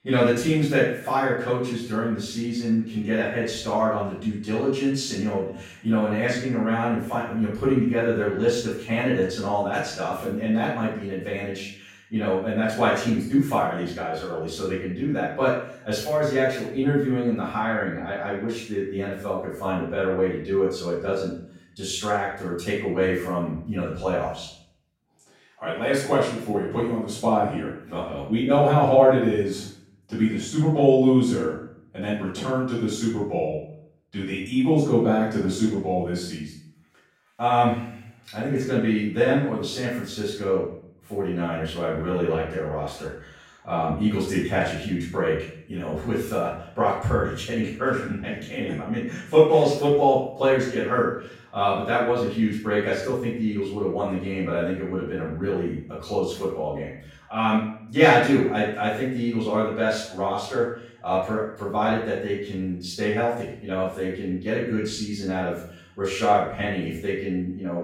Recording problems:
off-mic speech; far
room echo; noticeable; dies away in 0.6 s

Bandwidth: 16.5 kHz